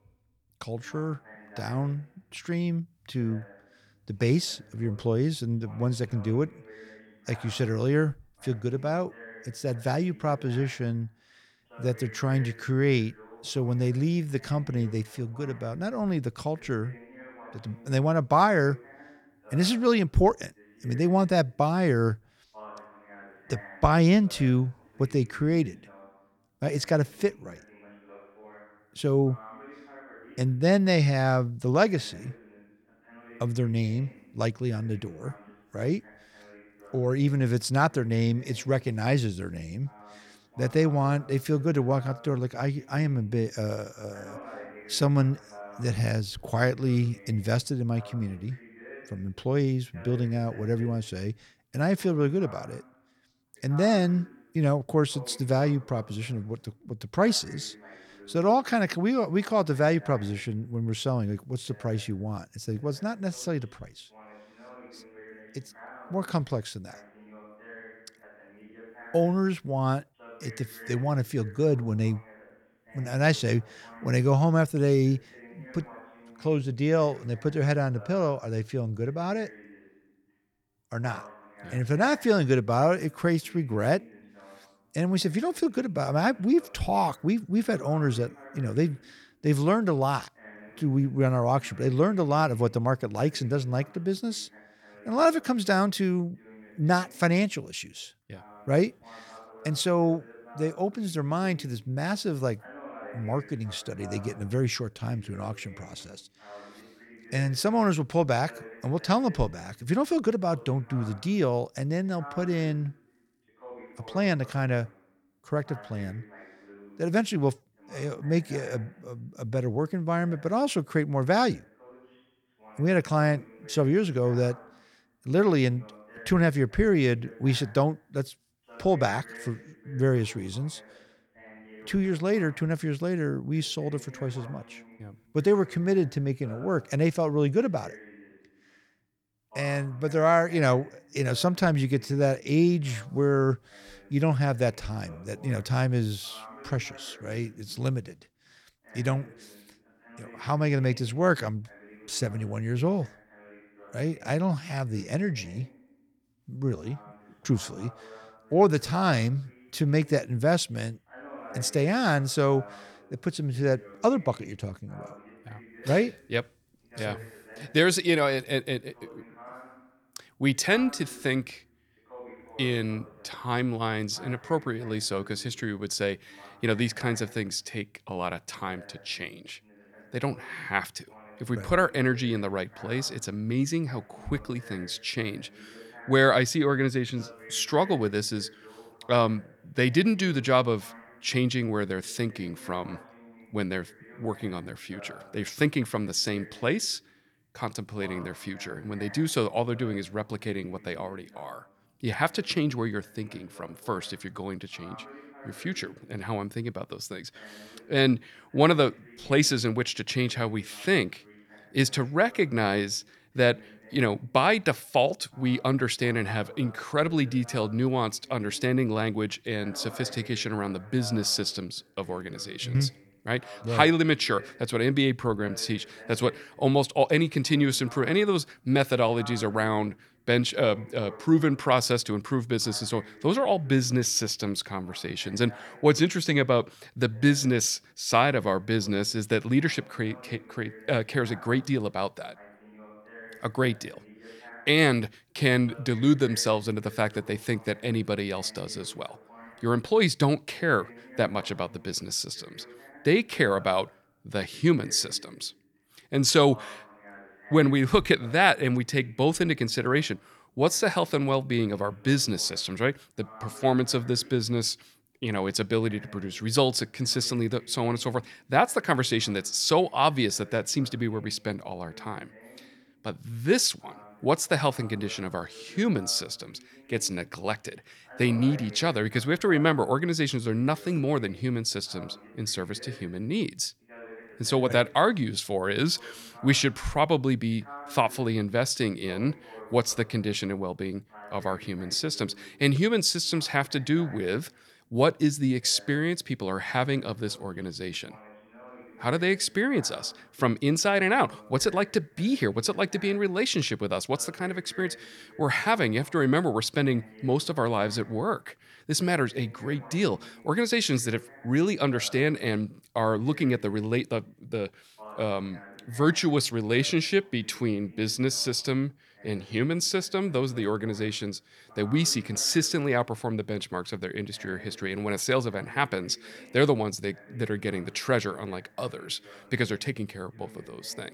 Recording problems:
voice in the background; faint; throughout; 25 dB below the speech

